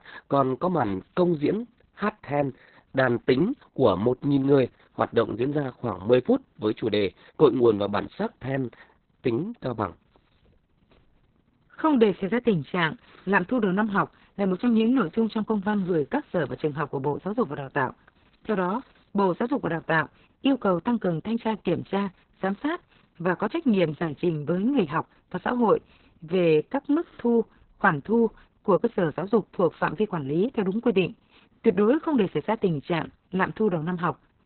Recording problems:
garbled, watery; badly; nothing above 4 kHz

